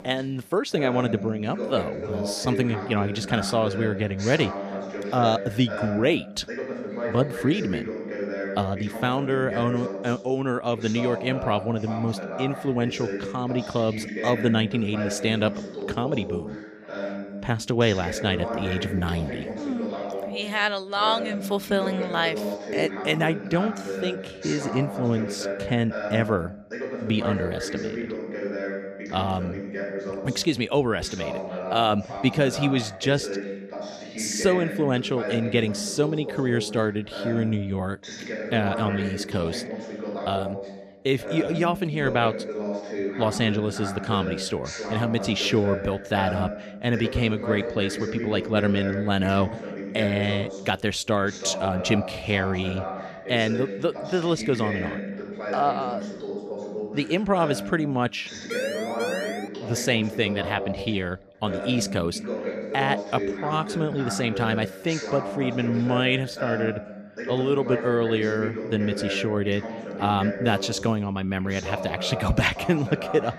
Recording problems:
voice in the background; loud; throughout; 7 dB below the speech
siren; noticeable; at 59 s; peak 4 dB below the speech

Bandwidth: 15 kHz